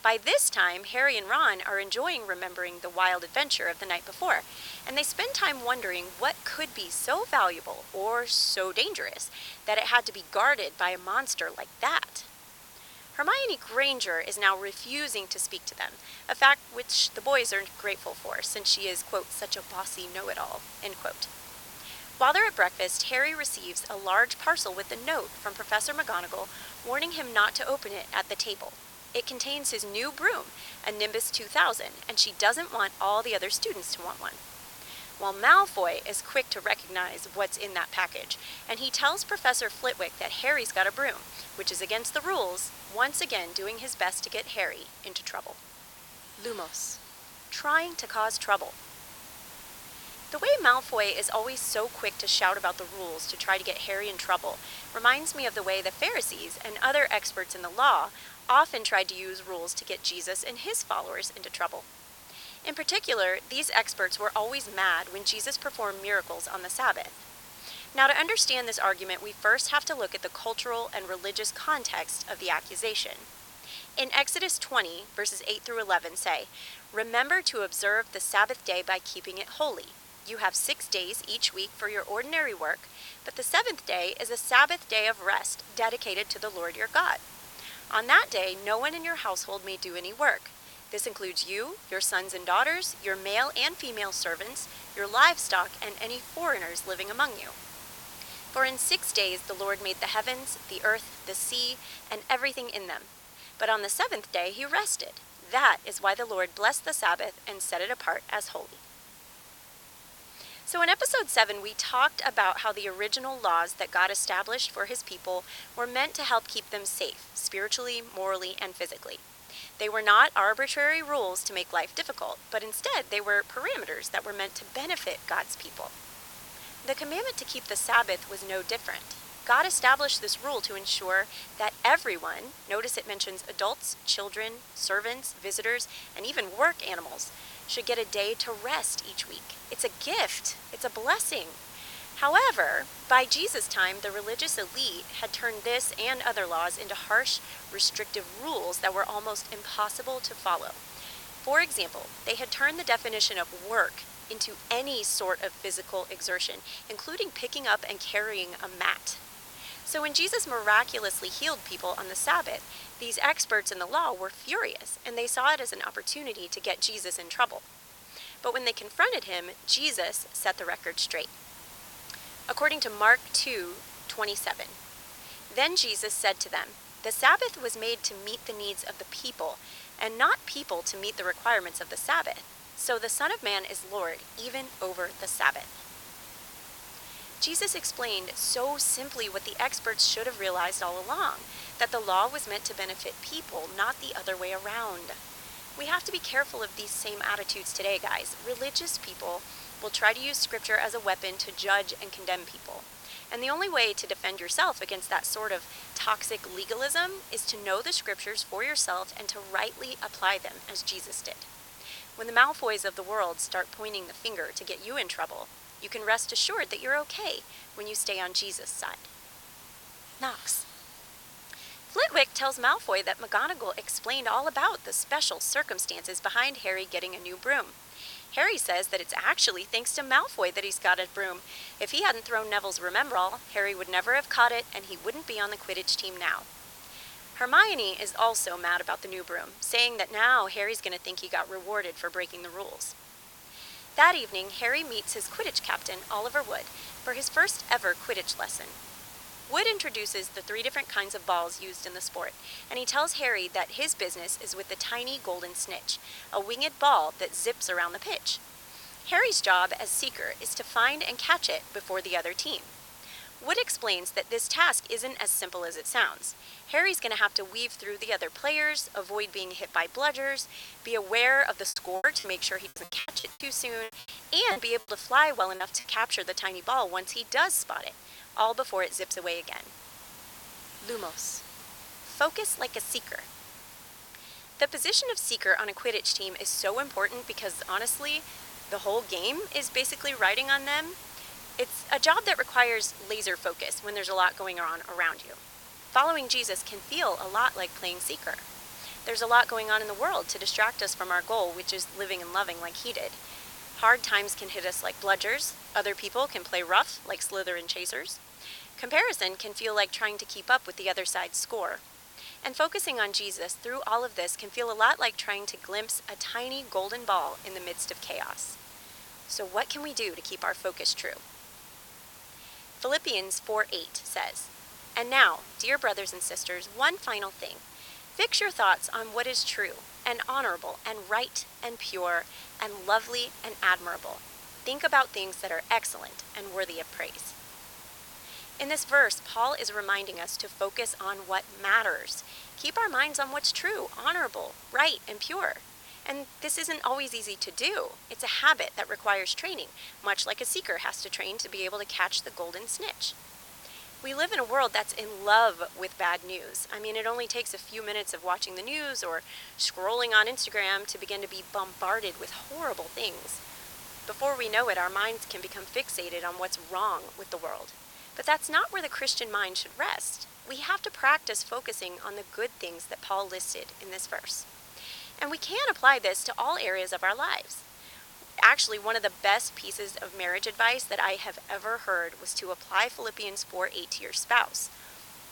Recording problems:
thin; very; fading below 550 Hz
hiss; noticeable; throughout; 15 dB below the speech
choppy; very; from 4:32 to 4:36; 24% of the speech affected

